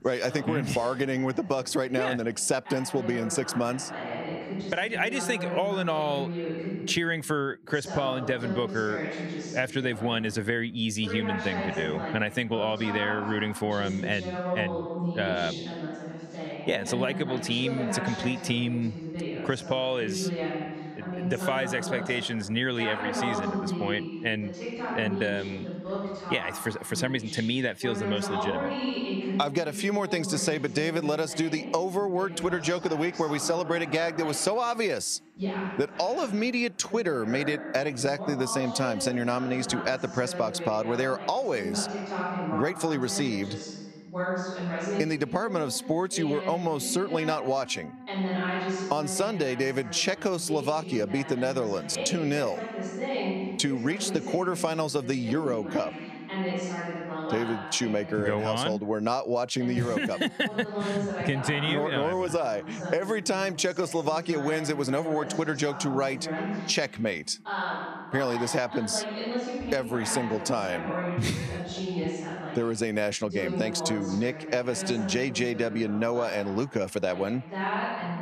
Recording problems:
squashed, flat; somewhat, background pumping
voice in the background; loud; throughout; 6 dB below the speech

